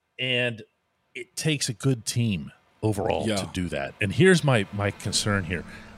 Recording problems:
traffic noise; faint; throughout; 25 dB below the speech
uneven, jittery; strongly; from 1 to 5 s

